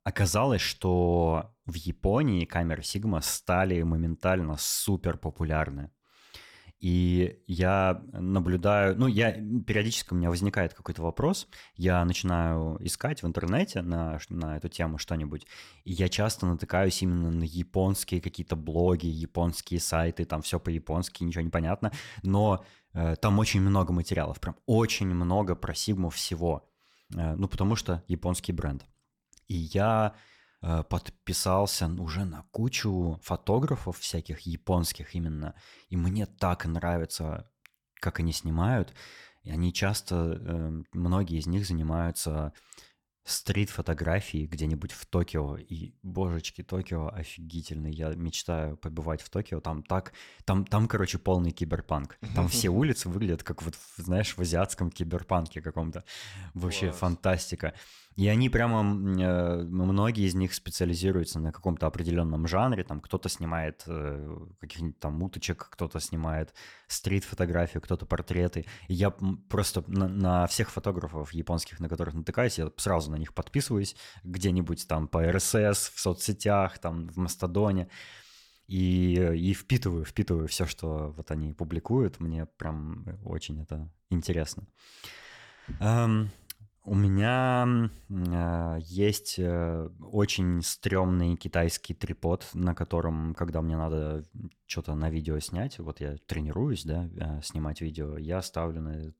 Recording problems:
none

